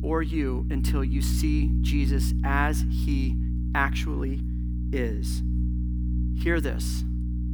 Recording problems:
electrical hum; loud; throughout; 60 Hz, 9 dB below the speech

